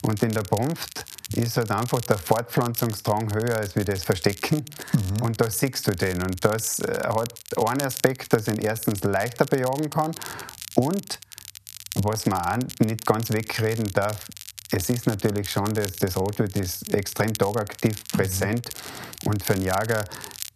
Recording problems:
squashed, flat; somewhat
crackle, like an old record; noticeable; 10 dB below the speech

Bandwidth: 14 kHz